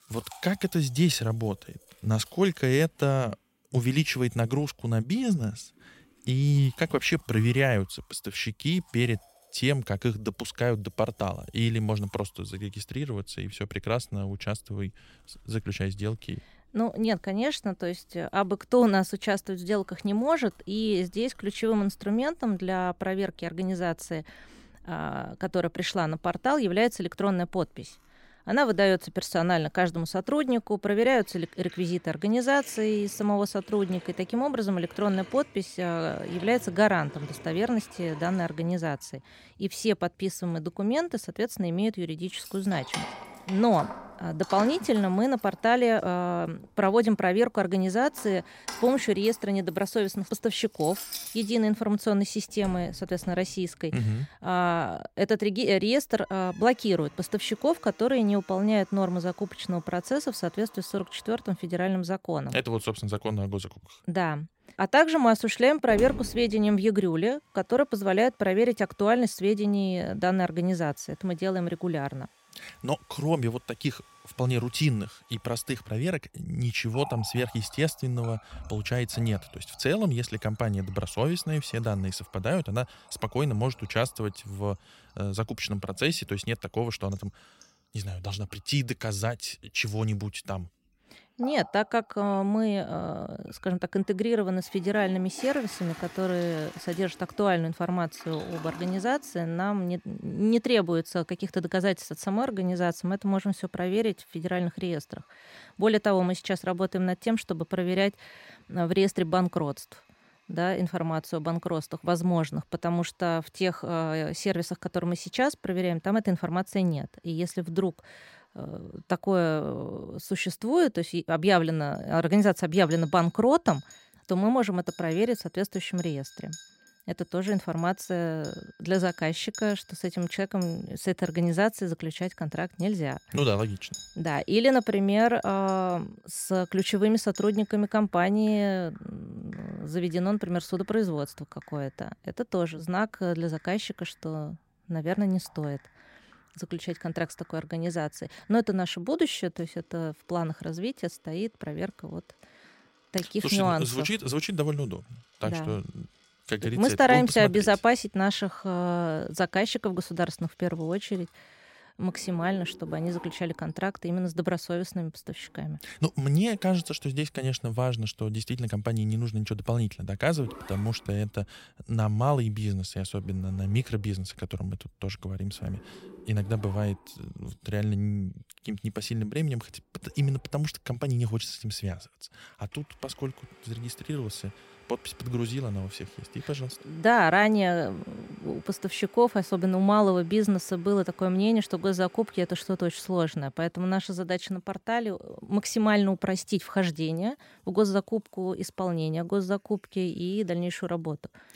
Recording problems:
household noises; noticeable; throughout; 20 dB below the speech

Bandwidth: 16 kHz